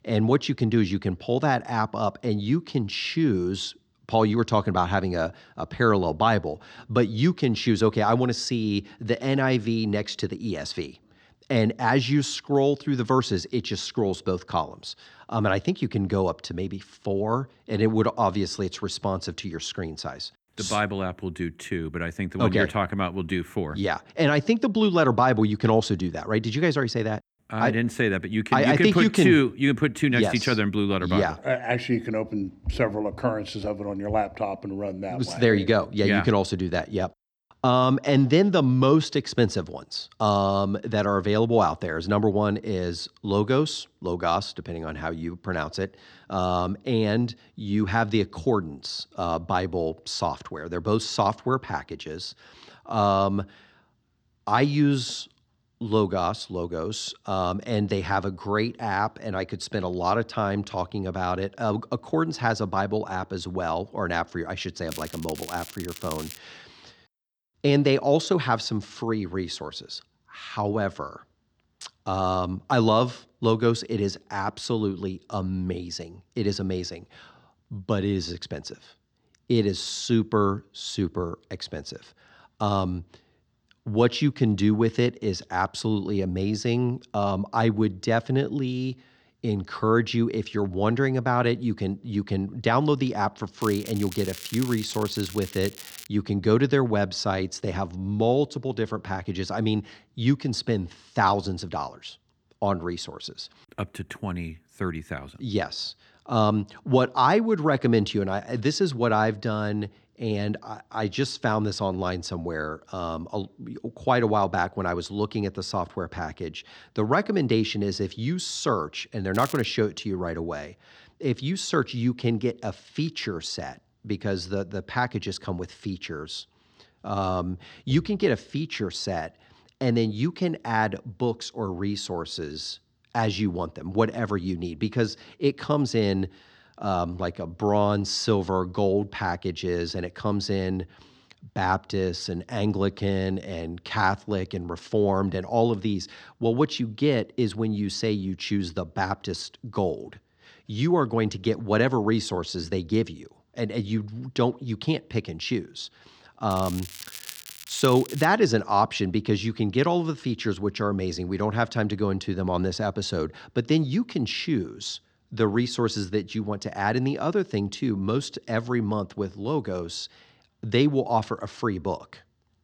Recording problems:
crackling; noticeable; 4 times, first at 1:05; 15 dB below the speech

